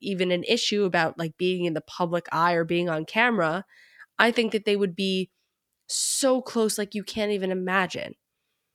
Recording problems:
none

